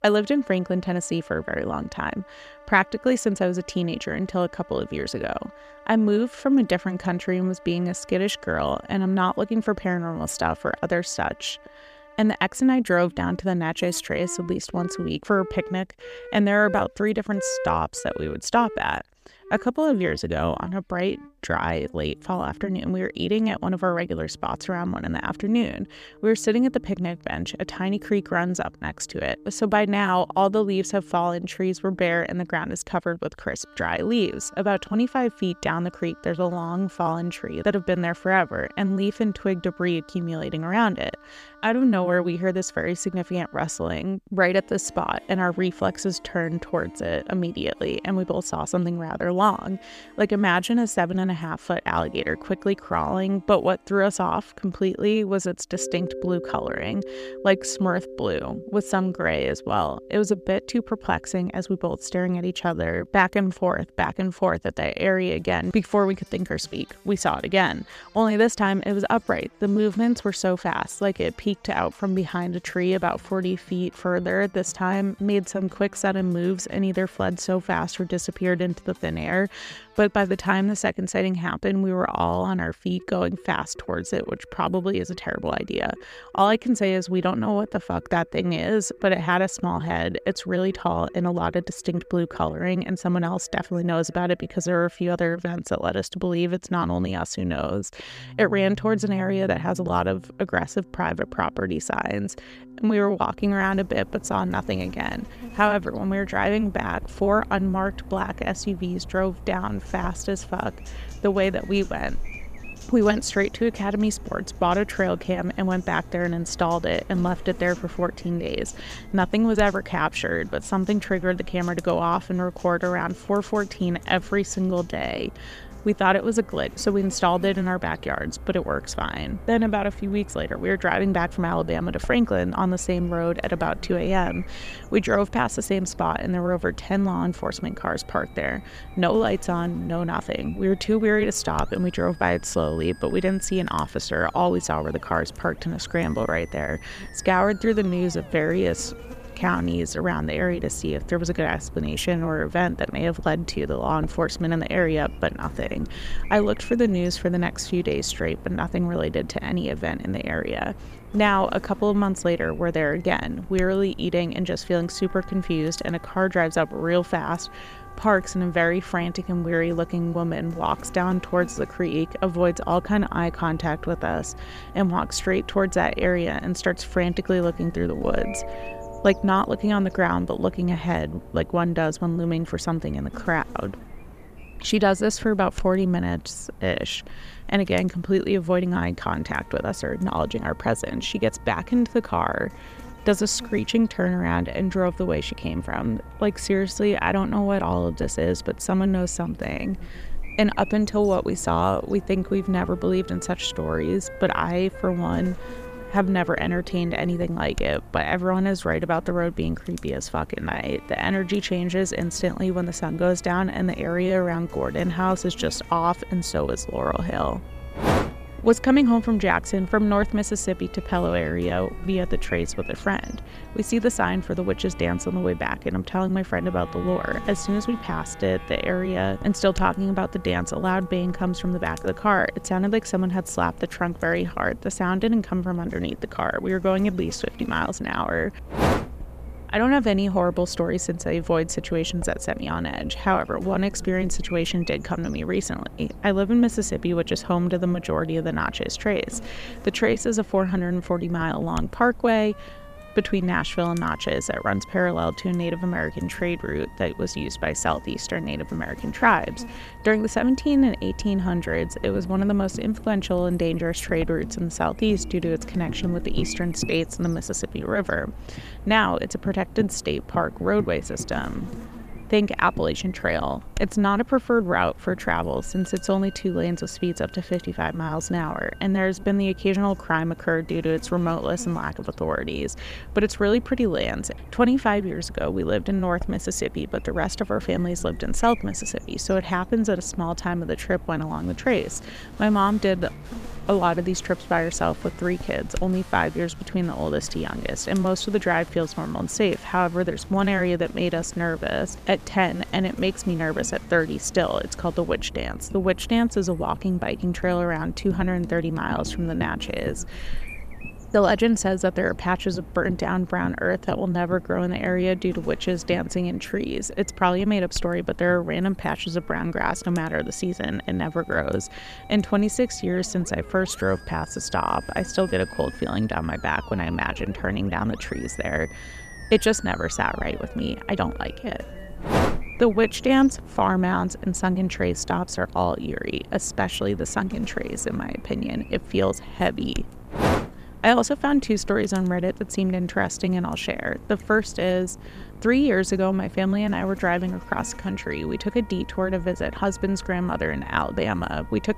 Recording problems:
electrical hum; faint; from 1:43 on; 50 Hz, 25 dB below the speech
background music; faint; throughout; 20 dB below the speech

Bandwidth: 14.5 kHz